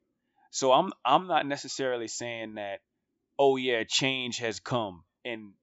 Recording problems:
high frequencies cut off; noticeable; nothing above 8 kHz

